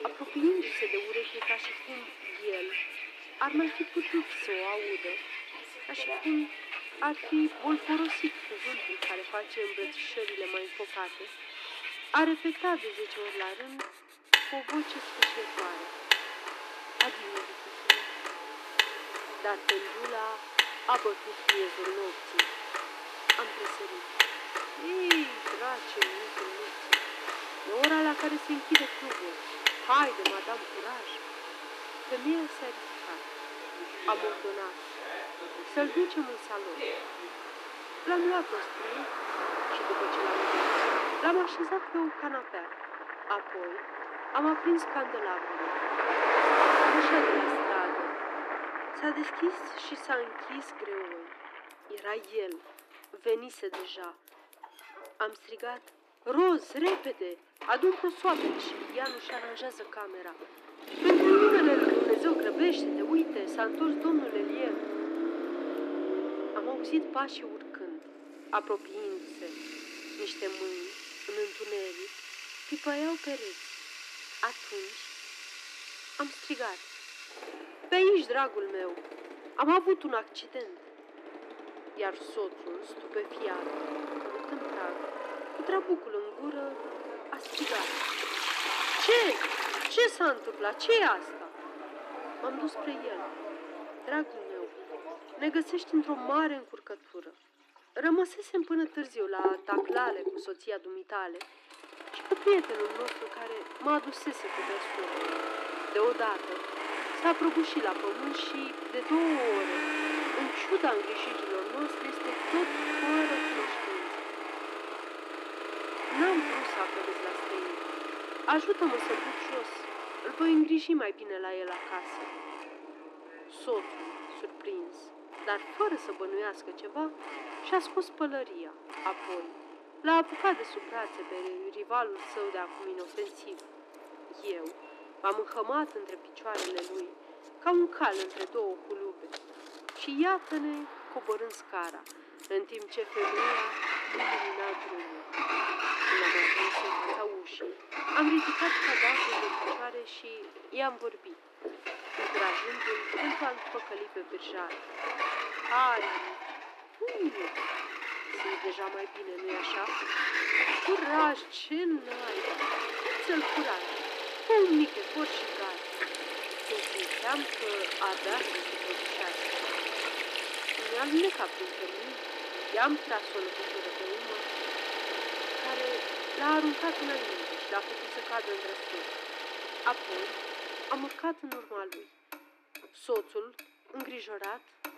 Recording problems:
thin; somewhat; fading below 300 Hz
muffled; very slightly; fading above 4 kHz
household noises; loud; throughout; 3 dB below the speech
traffic noise; loud; throughout; 1 dB below the speech

